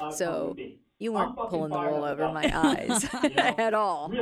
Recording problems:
voice in the background; loud; throughout; 8 dB below the speech

